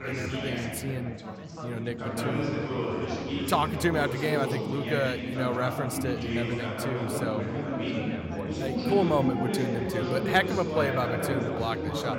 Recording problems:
chatter from many people; loud; throughout; 1 dB below the speech

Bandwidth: 16 kHz